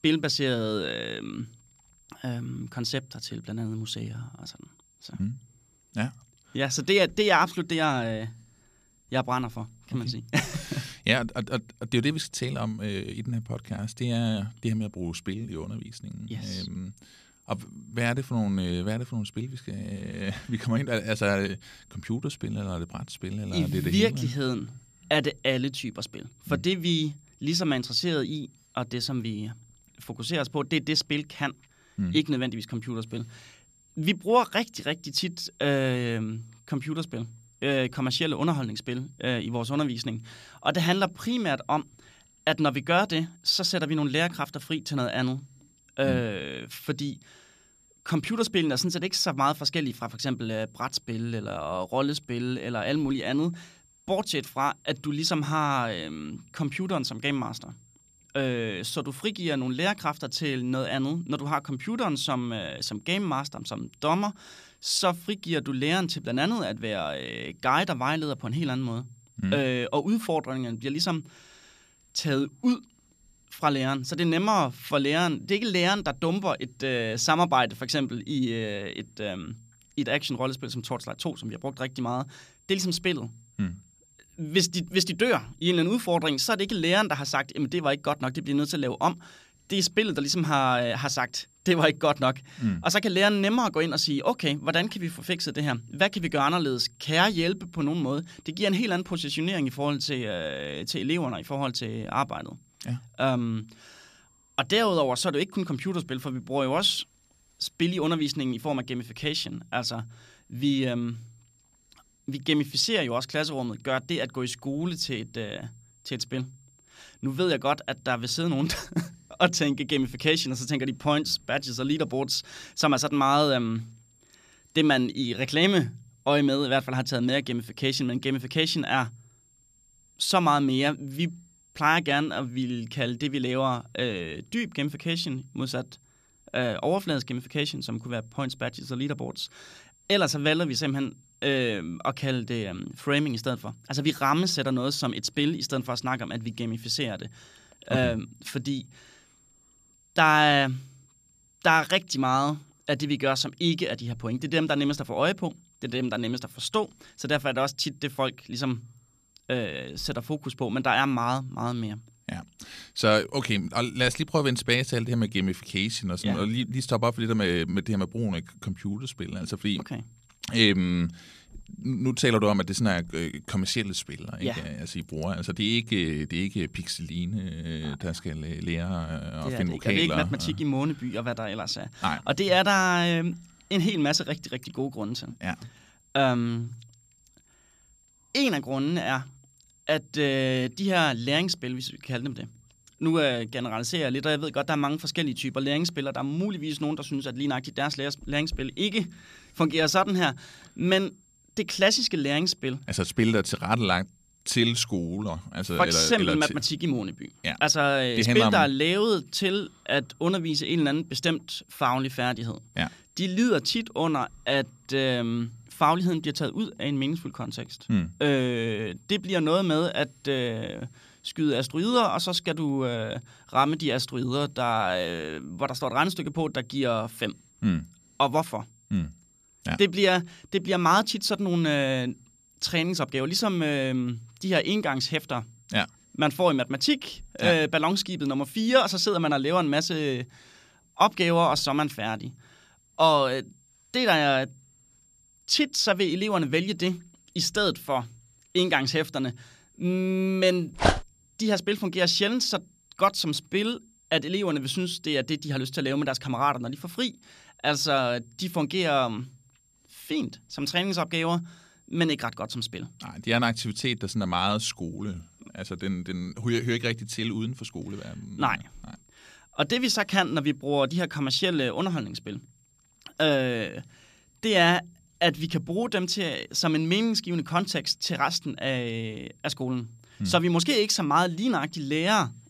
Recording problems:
high-pitched whine; faint; throughout; 7.5 kHz, 35 dB below the speech
dog barking; loud; at 4:11; peak 3 dB above the speech

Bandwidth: 14.5 kHz